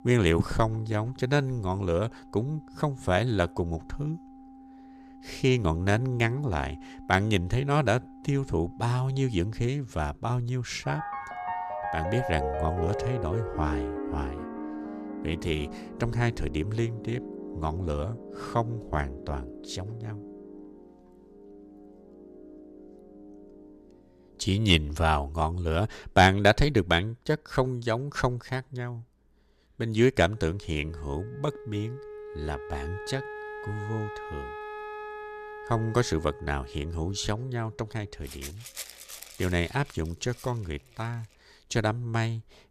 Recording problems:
background music; noticeable; throughout; 10 dB below the speech

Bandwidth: 14.5 kHz